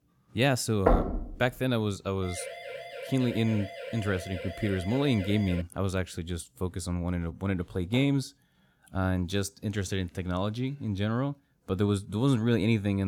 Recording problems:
door banging; loud; at 1 s; peak 3 dB above the speech
siren; noticeable; from 2 to 5.5 s; peak 10 dB below the speech
abrupt cut into speech; at the end

